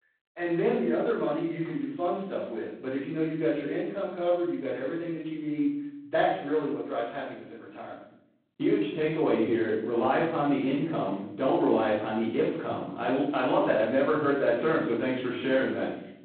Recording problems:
phone-call audio; poor line; nothing above 4 kHz
off-mic speech; far
room echo; noticeable; dies away in 0.7 s

